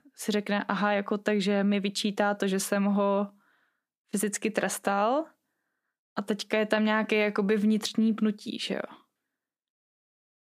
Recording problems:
none

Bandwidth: 15 kHz